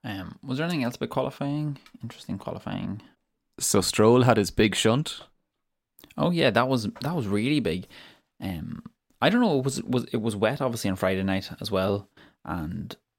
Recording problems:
none

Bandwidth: 16 kHz